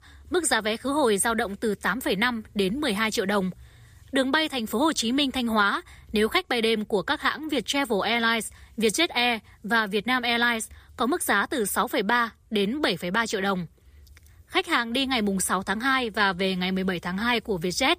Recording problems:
none

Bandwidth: 15 kHz